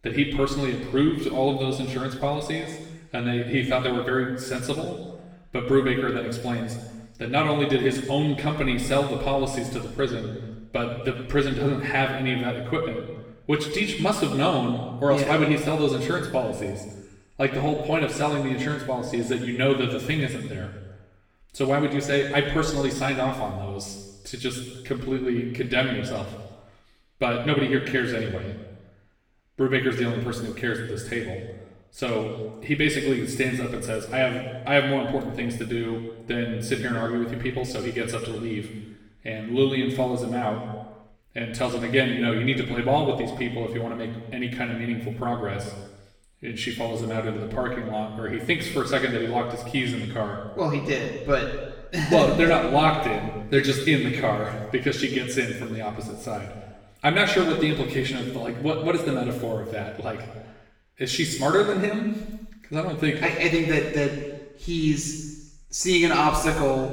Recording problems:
off-mic speech; far
room echo; noticeable; dies away in 1.1 s

